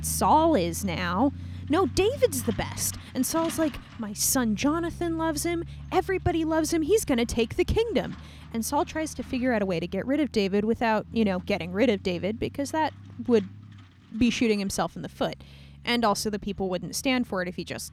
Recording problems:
traffic noise; noticeable; throughout; 15 dB below the speech

